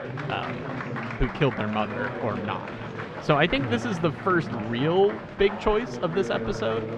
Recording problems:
muffled; slightly; fading above 2.5 kHz
chatter from many people; loud; throughout; 7 dB below the speech

